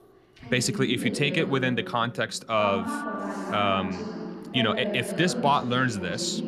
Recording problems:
voice in the background; loud; throughout; 7 dB below the speech

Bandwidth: 14.5 kHz